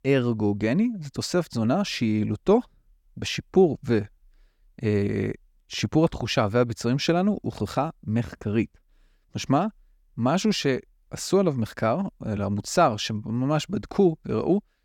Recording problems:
none

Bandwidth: 18 kHz